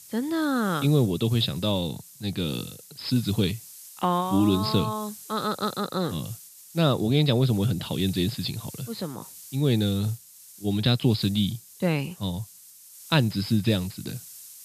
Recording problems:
high frequencies cut off; noticeable; nothing above 5.5 kHz
hiss; noticeable; throughout; 15 dB below the speech

